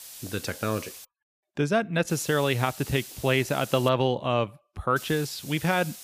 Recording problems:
hiss; noticeable; until 1 s, from 2 to 4 s and from 5 s on; 15 dB below the speech

